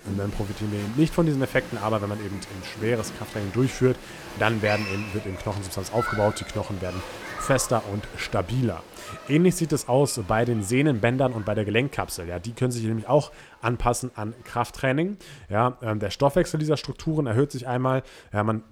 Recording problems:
crowd noise; noticeable; throughout; 10 dB below the speech

